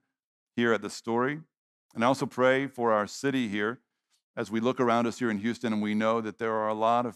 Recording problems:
none

